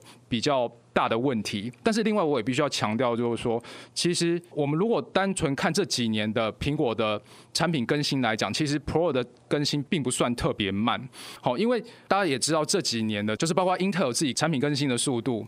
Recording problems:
squashed, flat; heavily

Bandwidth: 15.5 kHz